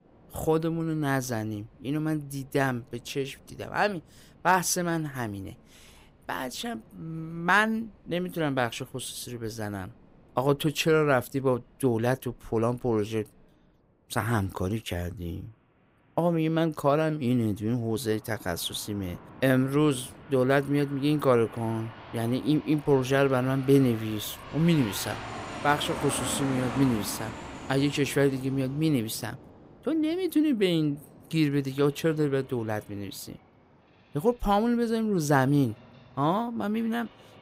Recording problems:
train or aircraft noise; noticeable; throughout; 15 dB below the speech

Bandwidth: 15.5 kHz